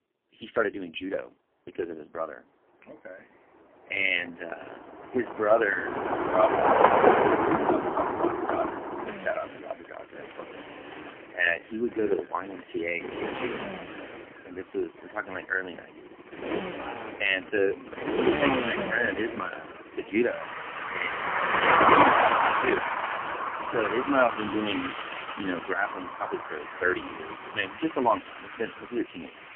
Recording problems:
phone-call audio; poor line; nothing above 3 kHz
traffic noise; very loud; throughout; 3 dB above the speech

